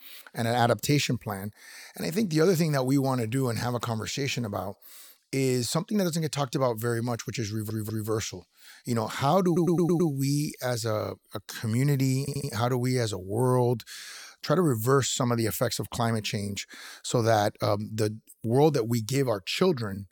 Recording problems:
audio stuttering; at 7.5 s, at 9.5 s and at 12 s

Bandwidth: 18.5 kHz